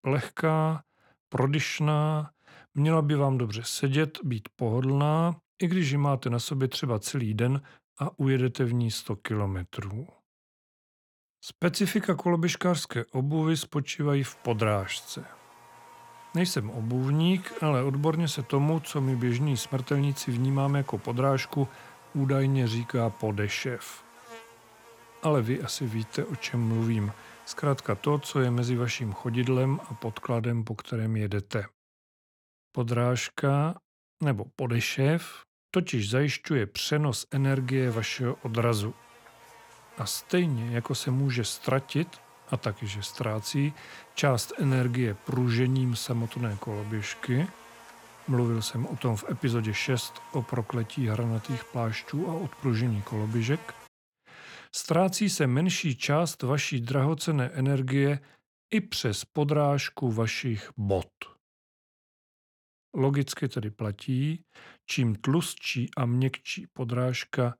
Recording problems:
electrical hum; noticeable; from 14 to 30 s and from 37 to 54 s; 50 Hz, 15 dB below the speech

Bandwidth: 17 kHz